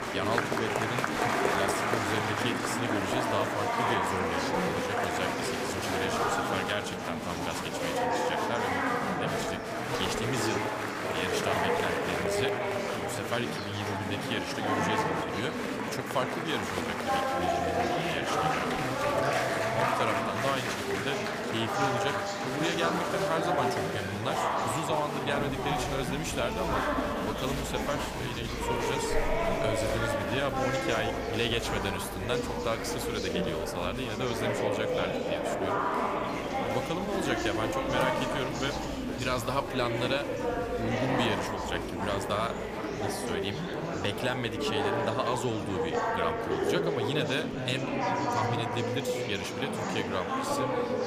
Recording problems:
murmuring crowd; very loud; throughout; 4 dB above the speech

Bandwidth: 15 kHz